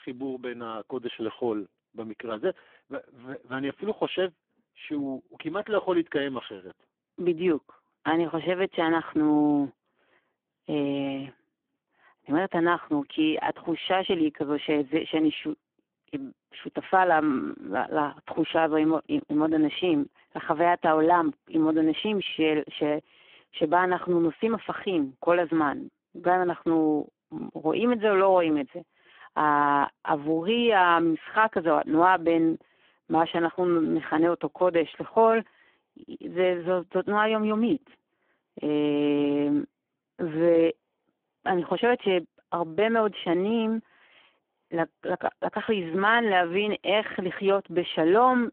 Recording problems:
phone-call audio; poor line

